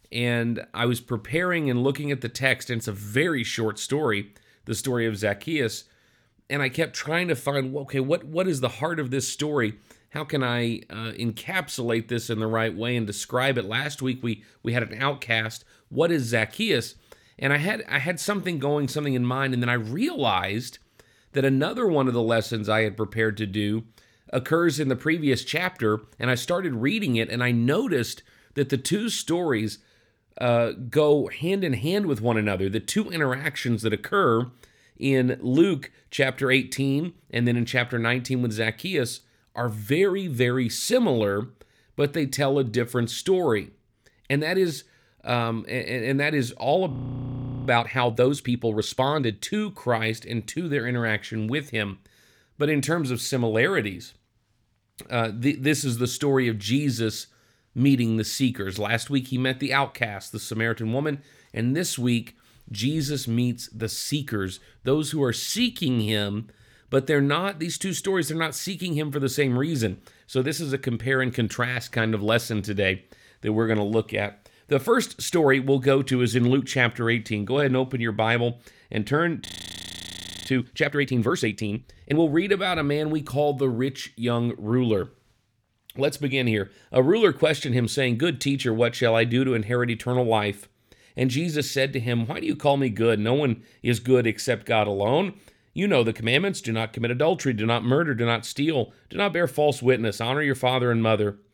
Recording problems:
audio freezing; at 47 s for 1 s and at 1:19 for 1 s

